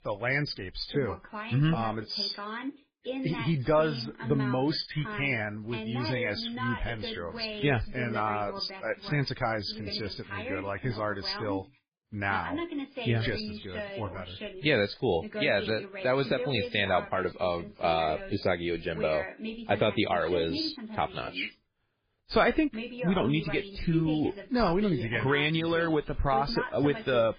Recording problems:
garbled, watery; badly; nothing above 5 kHz
voice in the background; loud; throughout; 9 dB below the speech

